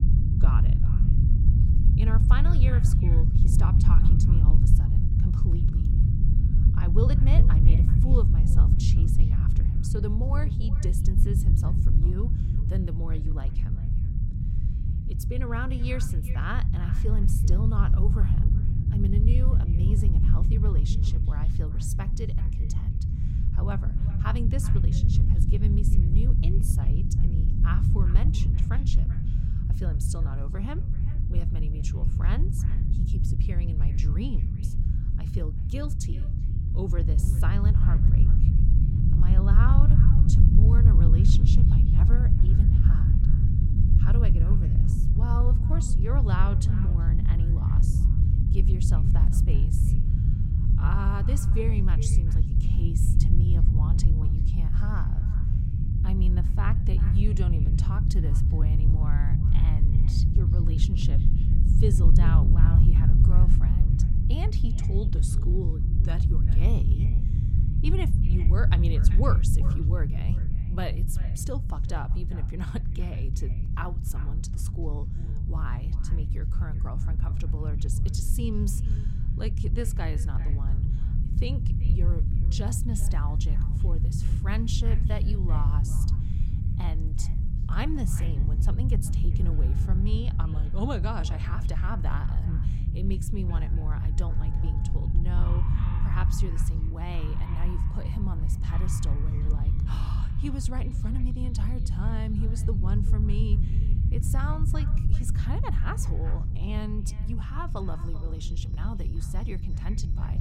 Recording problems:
echo of what is said; noticeable; throughout; 380 ms later, 15 dB below the speech
low rumble; loud; throughout; as loud as the speech
animal sounds; noticeable; from 1:18 on; 20 dB below the speech

